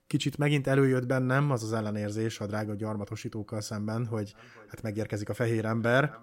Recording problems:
echo of what is said; faint; from 4.5 s on; 430 ms later, 25 dB below the speech

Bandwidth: 16 kHz